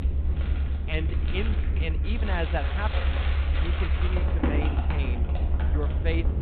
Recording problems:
high frequencies cut off; severe; nothing above 4 kHz
household noises; loud; throughout; 1 dB below the speech
low rumble; loud; throughout; 8 dB below the speech
murmuring crowd; faint; throughout; 20 dB below the speech

